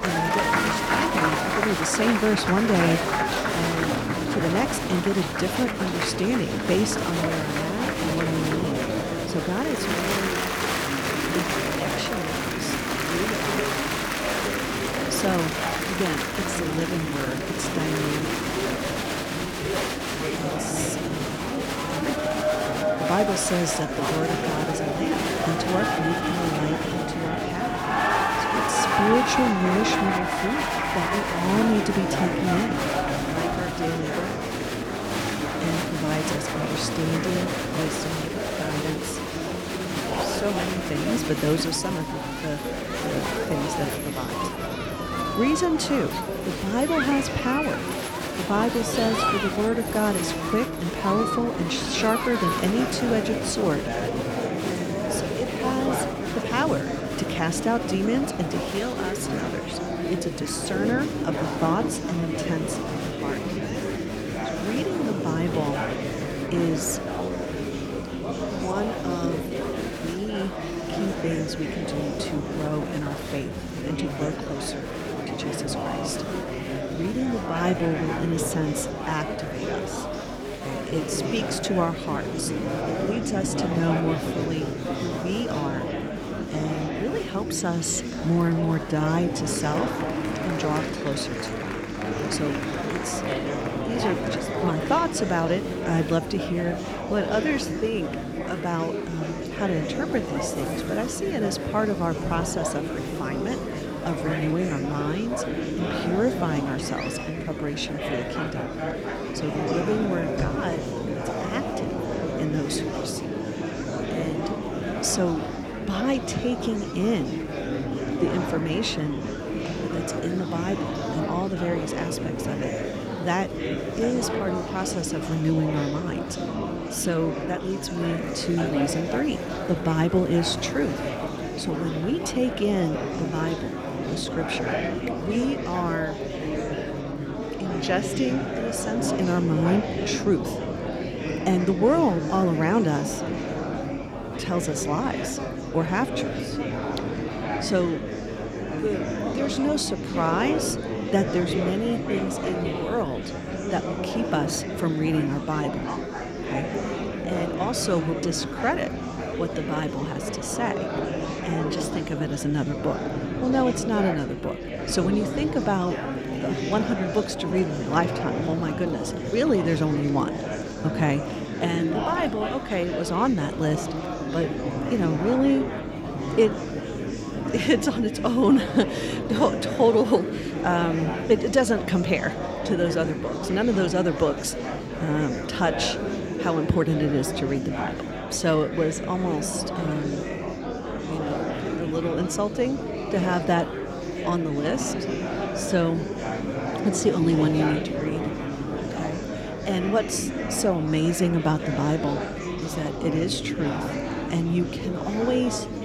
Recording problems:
murmuring crowd; loud; throughout; 1 dB below the speech

